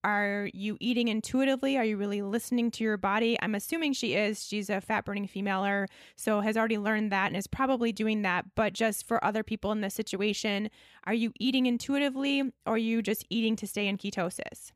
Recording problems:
none

